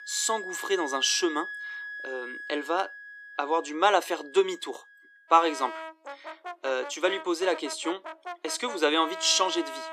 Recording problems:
thin; somewhat; fading below 300 Hz
background music; noticeable; throughout; 10 dB below the speech

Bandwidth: 14.5 kHz